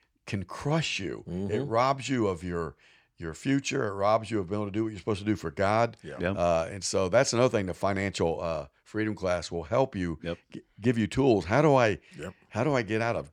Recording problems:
none

